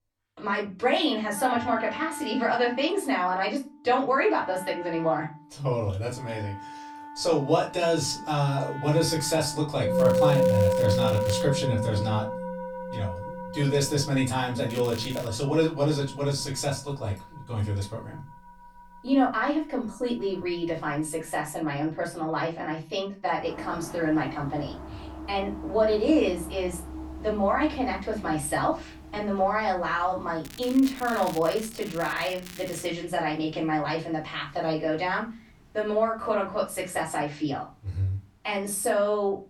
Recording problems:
off-mic speech; far
room echo; very slight; dies away in 0.2 s
background music; loud; throughout; 5 dB below the speech
crackling; noticeable; from 10 to 11 s, at 15 s and from 30 to 33 s; 15 dB below the speech

